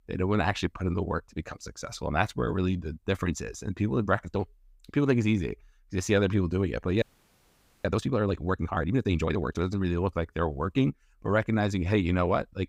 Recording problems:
audio freezing; at 7 s for 1 s

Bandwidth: 15.5 kHz